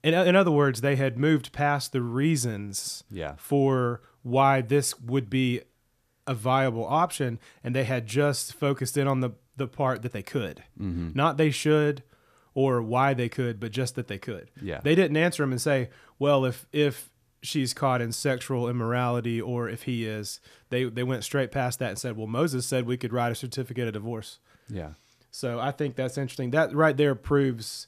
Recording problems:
none

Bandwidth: 14.5 kHz